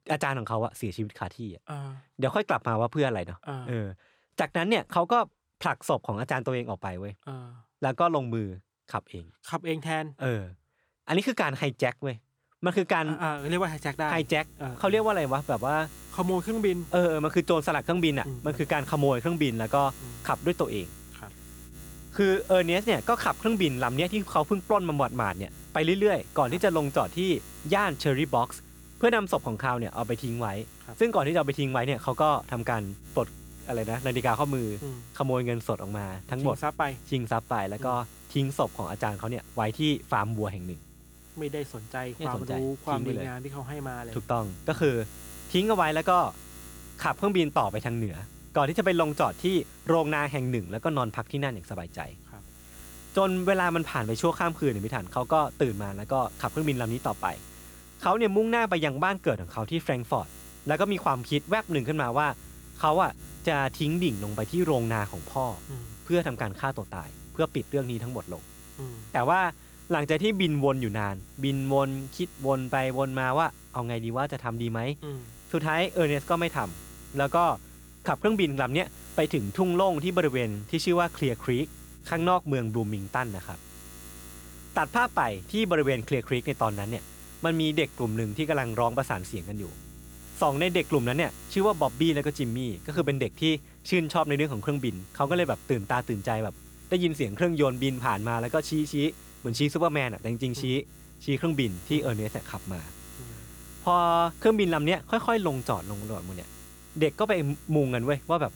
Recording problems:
electrical hum; faint; from 13 s on; 60 Hz, 25 dB below the speech

